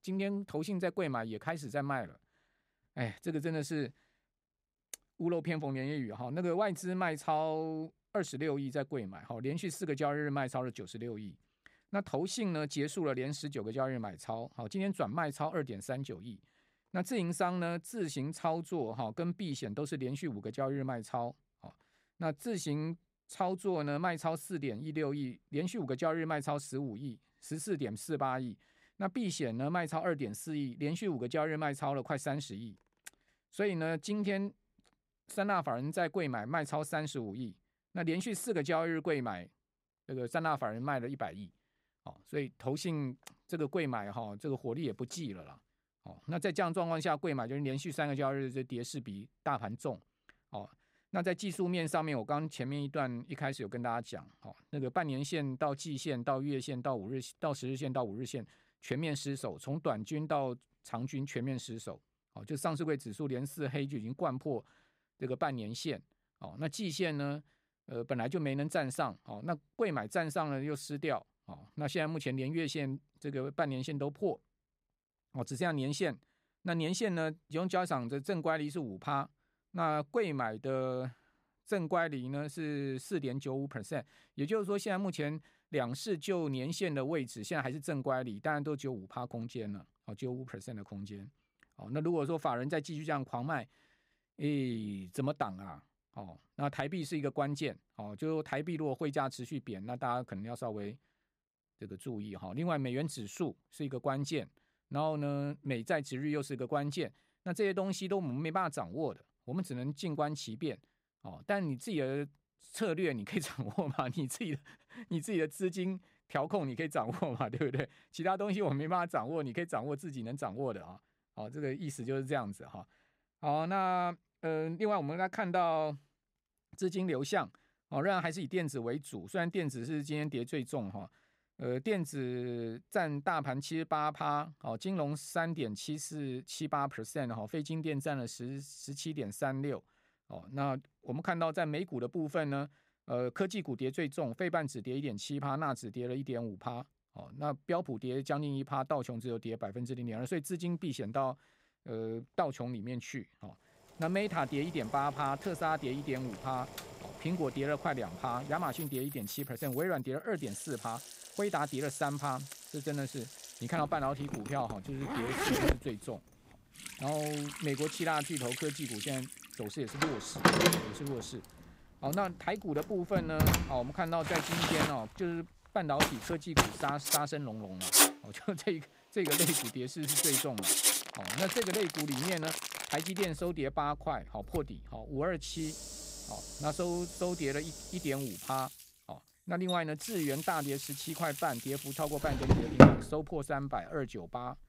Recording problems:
household noises; very loud; from 2:34 on; 5 dB above the speech

